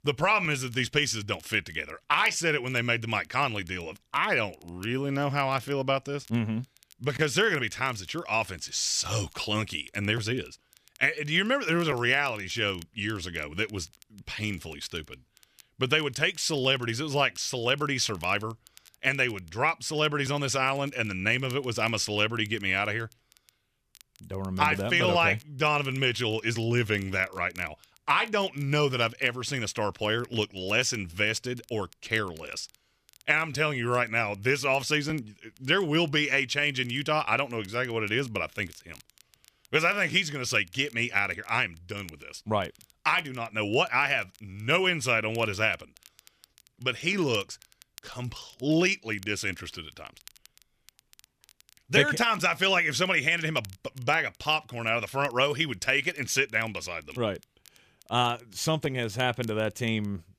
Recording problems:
crackle, like an old record; faint; 30 dB below the speech

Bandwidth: 14.5 kHz